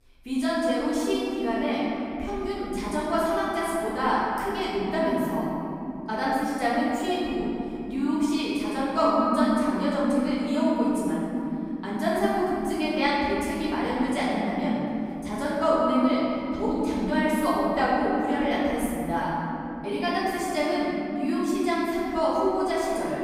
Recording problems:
room echo; strong; dies away in 3 s
off-mic speech; far

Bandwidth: 15.5 kHz